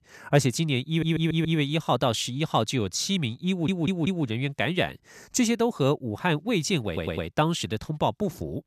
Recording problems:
audio stuttering; at 1 s, at 3.5 s and at 7 s

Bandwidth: 14.5 kHz